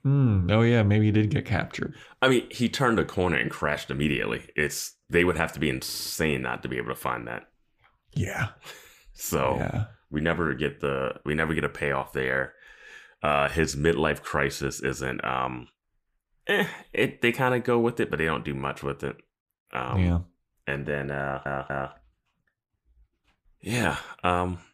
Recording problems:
audio stuttering; at 6 s and at 21 s

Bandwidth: 15 kHz